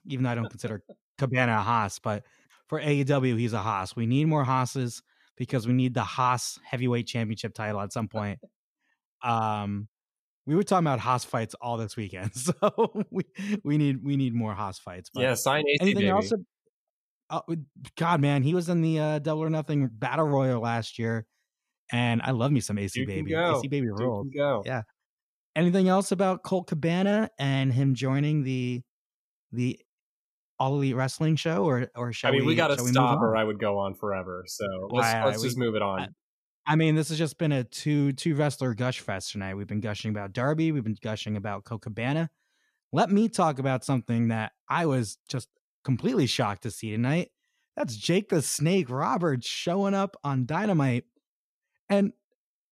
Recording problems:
none

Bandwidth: 14.5 kHz